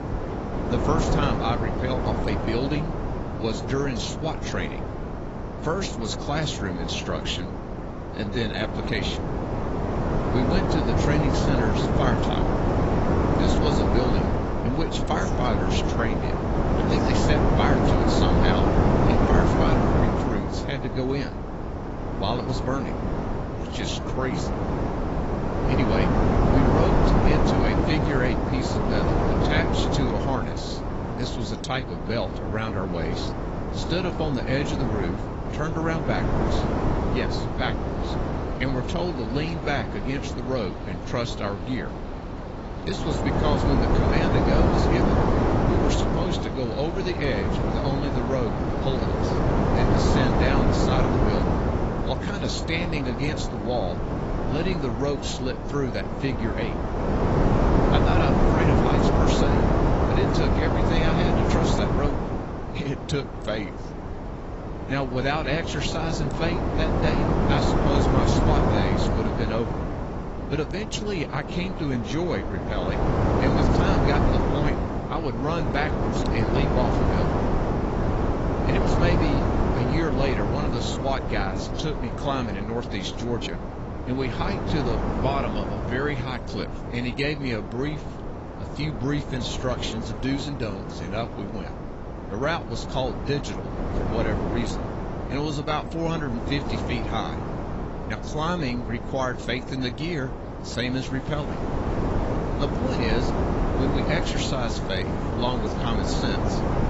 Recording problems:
garbled, watery; badly; nothing above 8 kHz
wind noise on the microphone; heavy; 1 dB above the speech
rain or running water; faint; throughout; 20 dB below the speech

